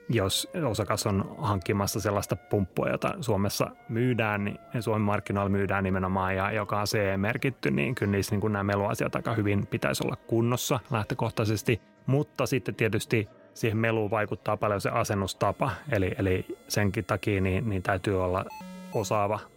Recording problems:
background music; faint; throughout; 30 dB below the speech
background chatter; faint; throughout; 4 voices, 30 dB below the speech
alarm; faint; at 19 s; peak 15 dB below the speech

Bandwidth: 16 kHz